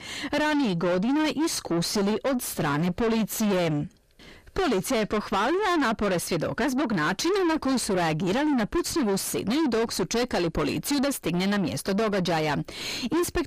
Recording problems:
distortion; heavy; 5 dB below the speech

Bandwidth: 15 kHz